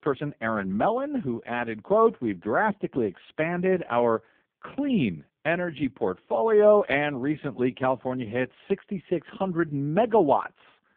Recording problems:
phone-call audio; poor line

